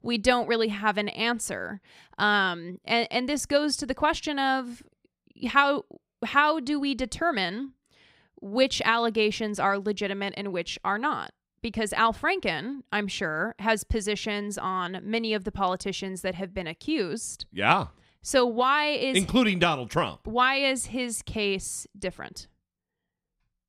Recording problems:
none

